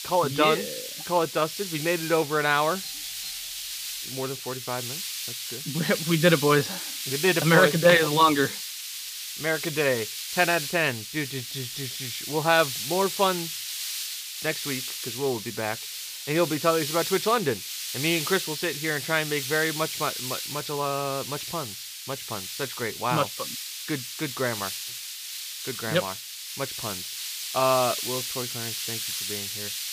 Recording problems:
high frequencies cut off; noticeable; nothing above 6 kHz
hiss; loud; throughout; 6 dB below the speech
doorbell; faint; at 3 s; peak 15 dB below the speech

